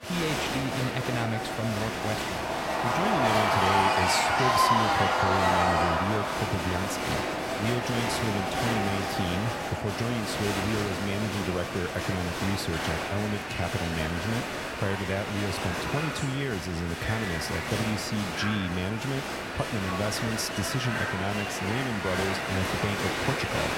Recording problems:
crowd noise; very loud; throughout; 3 dB above the speech

